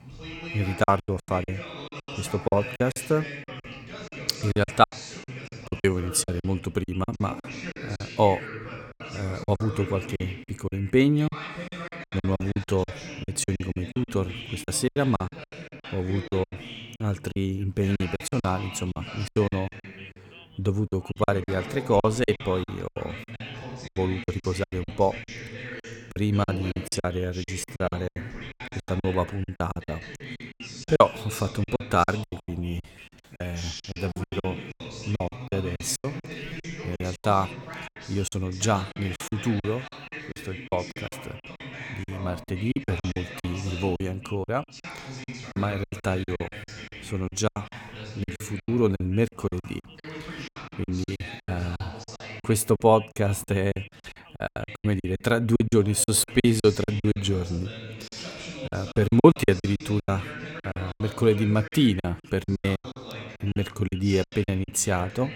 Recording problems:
background chatter; noticeable; throughout; 2 voices, 10 dB below the speech
choppy; very; 17% of the speech affected

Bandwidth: 17.5 kHz